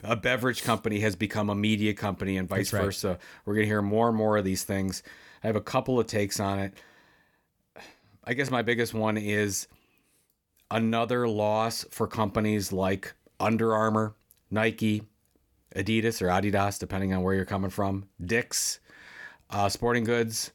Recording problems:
none

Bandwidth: 18.5 kHz